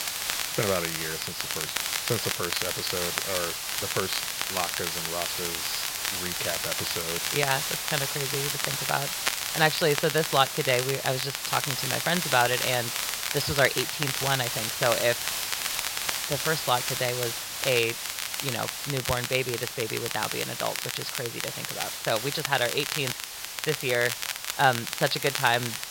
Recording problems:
high frequencies cut off; noticeable; nothing above 5.5 kHz
hiss; loud; throughout; 2 dB below the speech
crackle, like an old record; loud; 4 dB below the speech

